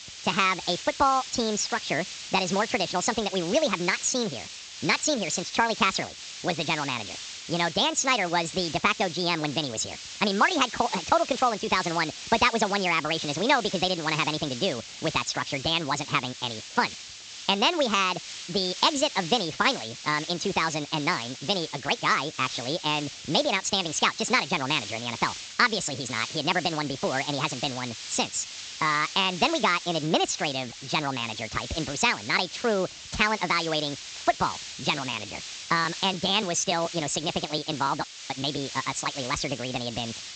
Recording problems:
wrong speed and pitch; too fast and too high; 1.7 times normal speed
high frequencies cut off; noticeable; nothing above 8 kHz
hiss; noticeable; throughout; 10 dB below the speech

